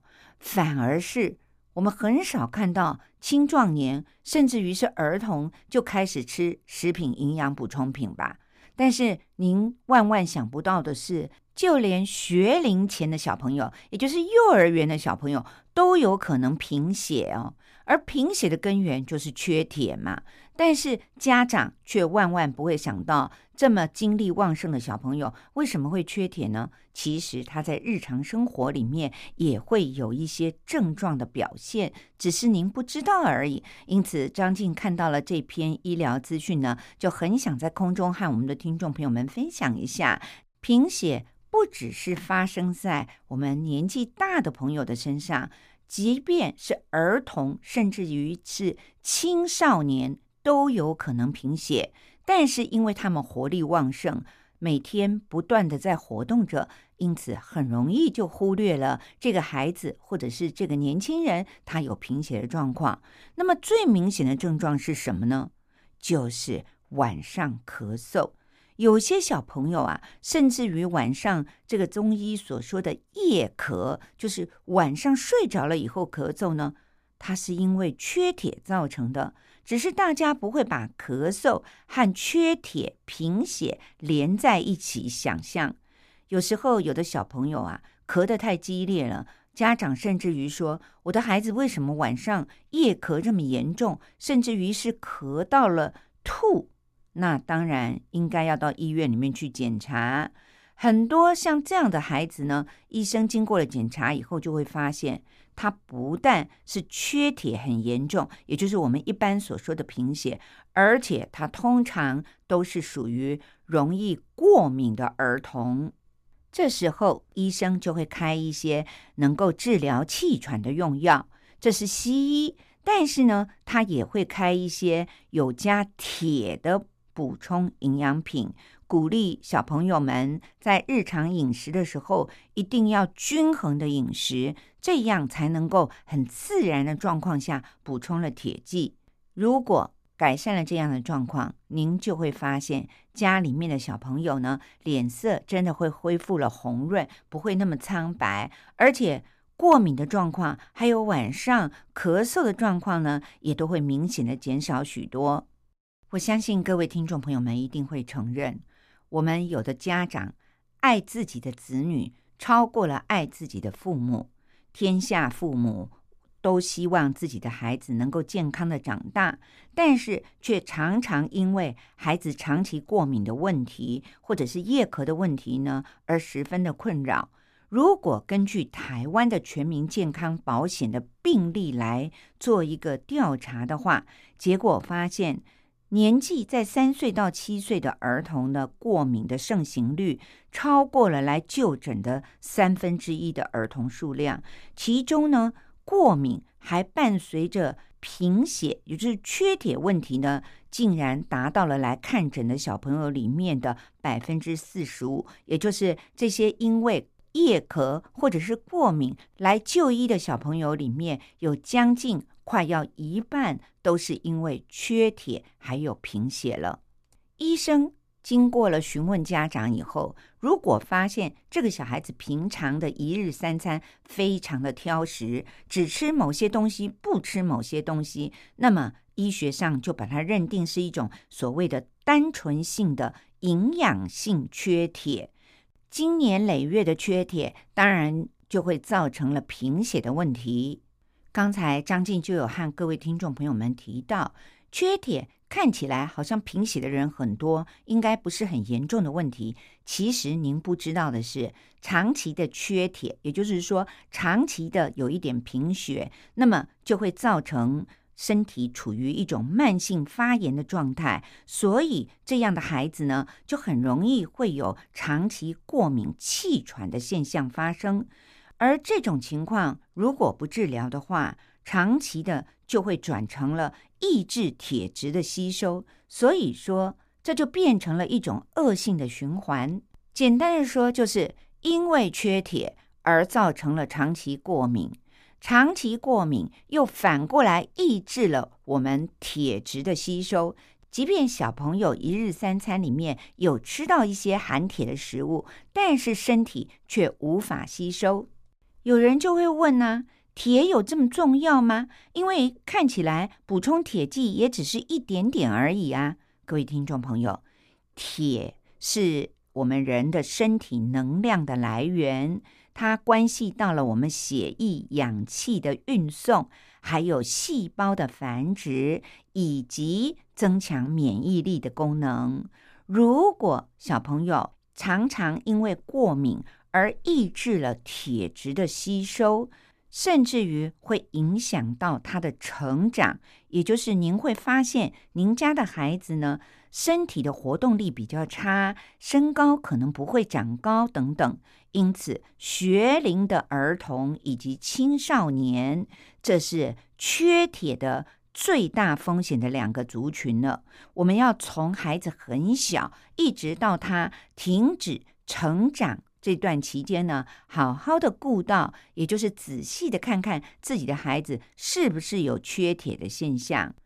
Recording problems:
none

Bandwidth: 15 kHz